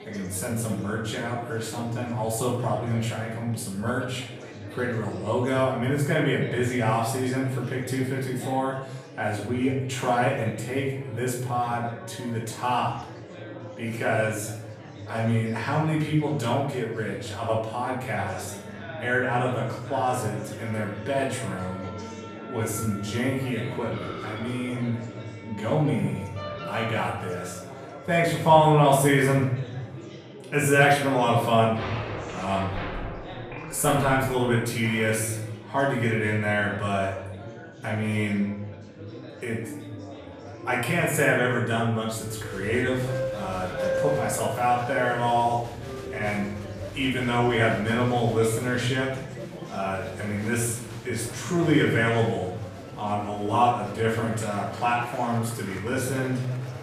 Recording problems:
off-mic speech; far
room echo; noticeable; dies away in 0.8 s
background music; noticeable; throughout; 15 dB below the speech
chatter from many people; noticeable; throughout; 15 dB below the speech

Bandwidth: 14.5 kHz